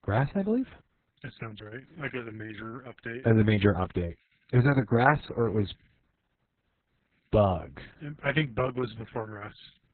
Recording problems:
garbled, watery; badly; nothing above 4 kHz

